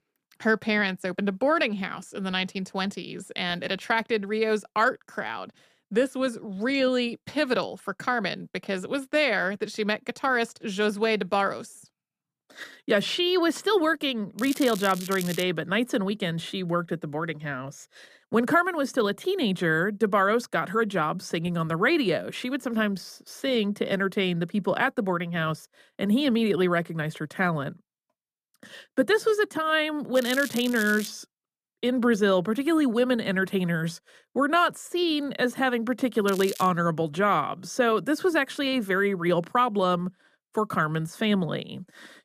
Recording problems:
crackling; noticeable; from 14 to 15 s, at 30 s and at 36 s; 10 dB below the speech

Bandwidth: 14.5 kHz